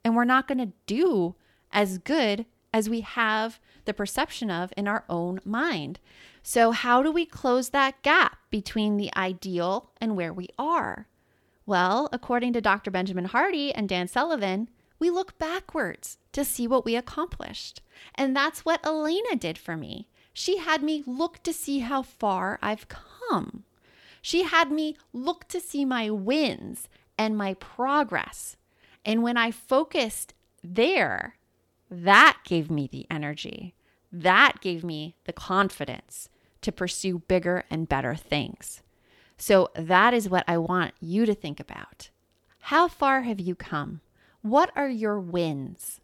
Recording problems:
none

